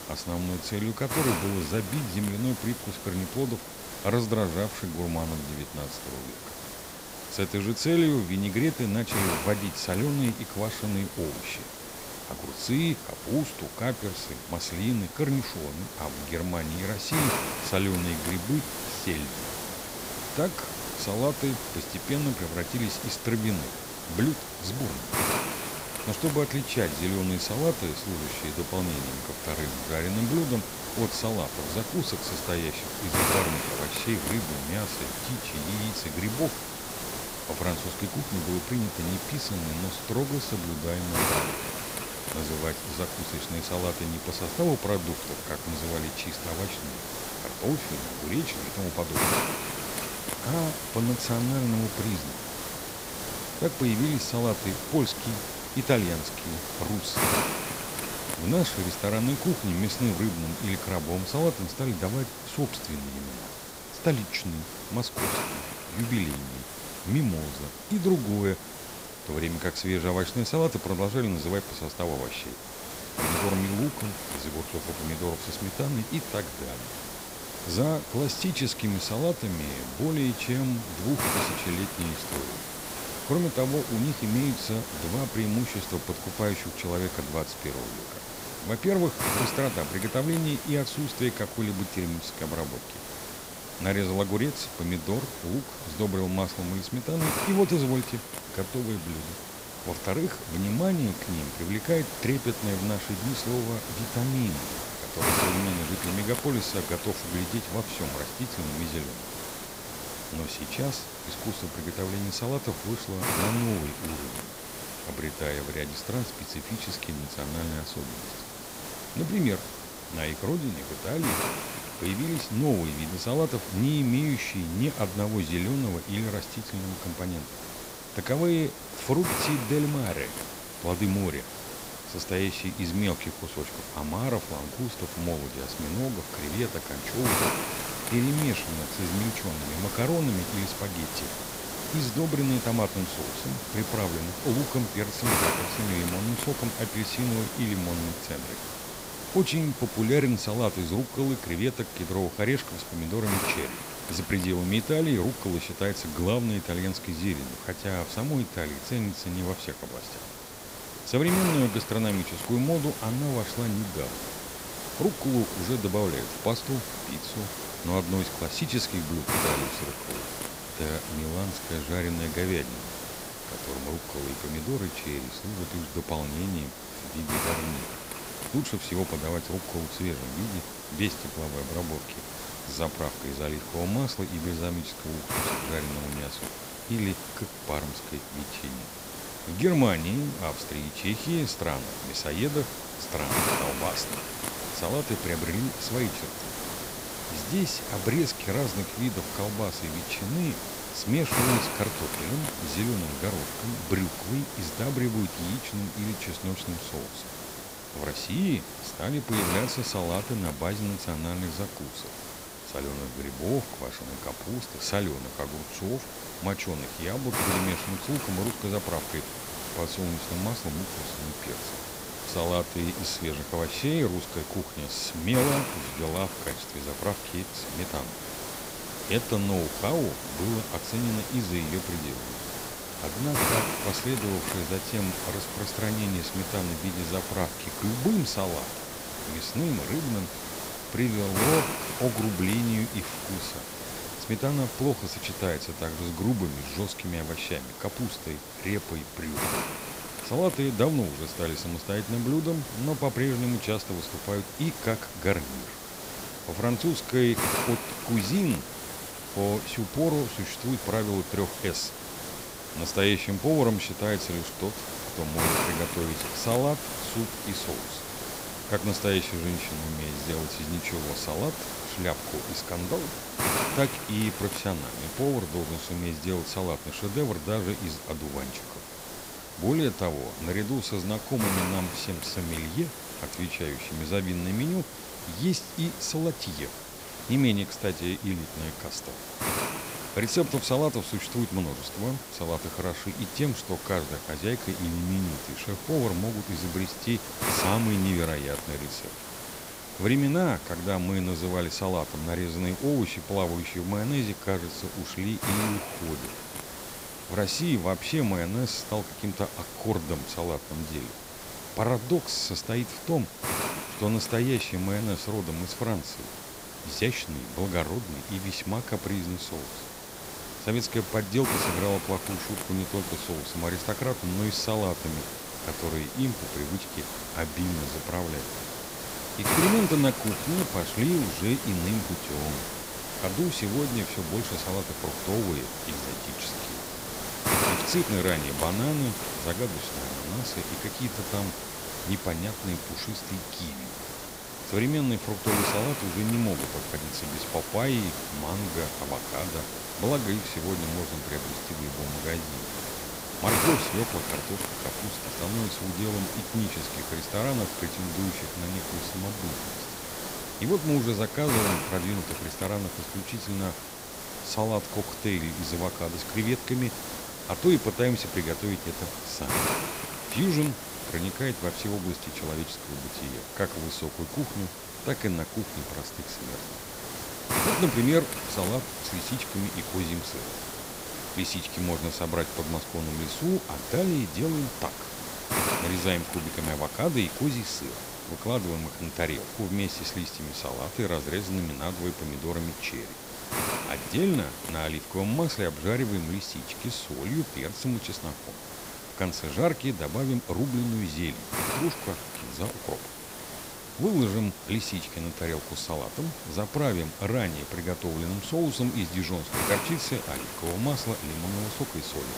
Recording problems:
hiss; loud; throughout; 4 dB below the speech

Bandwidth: 15.5 kHz